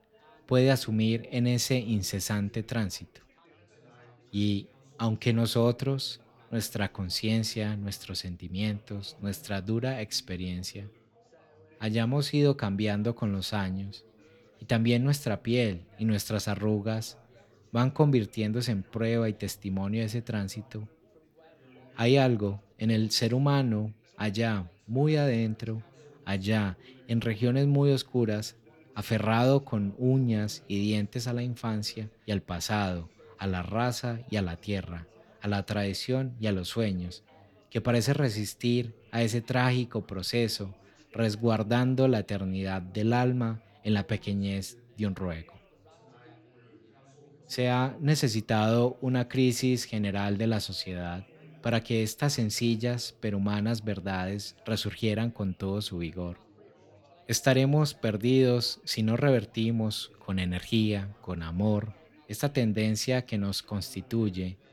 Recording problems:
background chatter; faint; throughout; 4 voices, 30 dB below the speech

